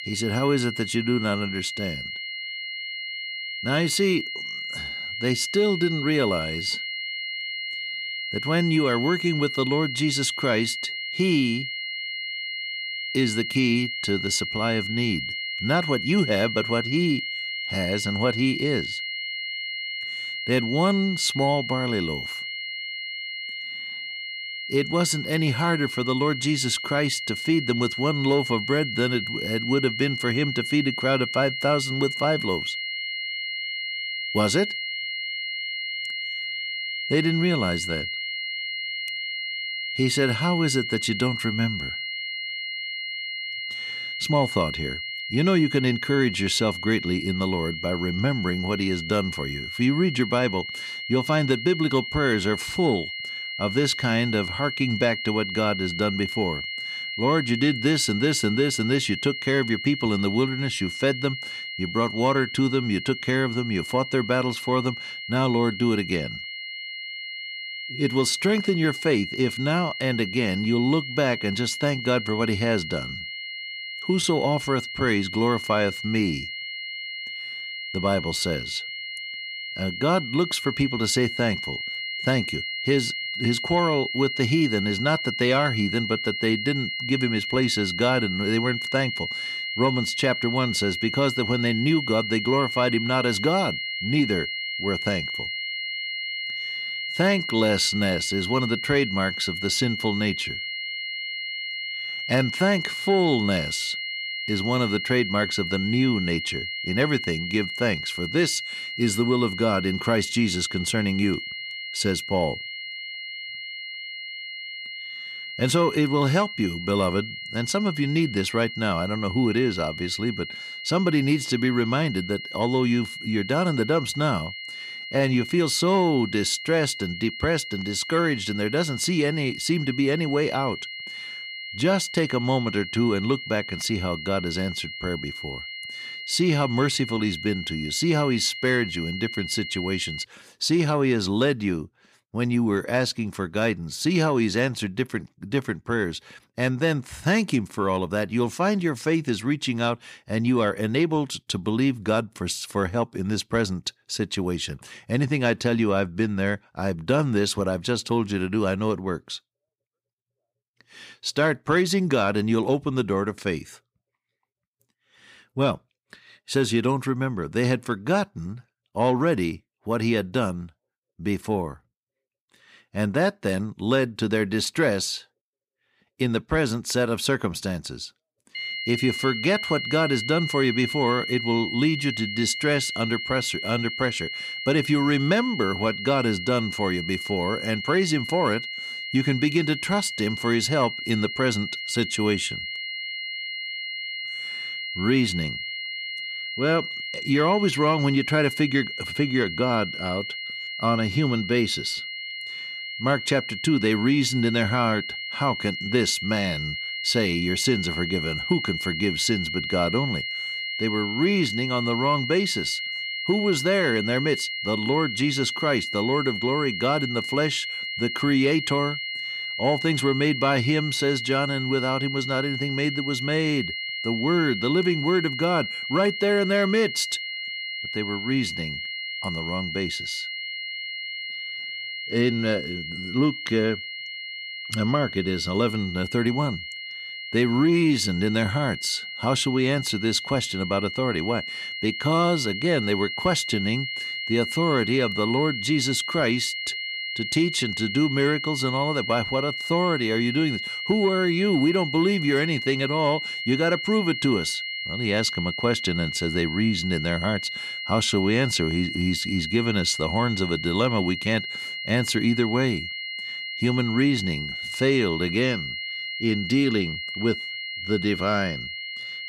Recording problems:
high-pitched whine; loud; until 2:20 and from 2:59 on; 2 kHz, 5 dB below the speech

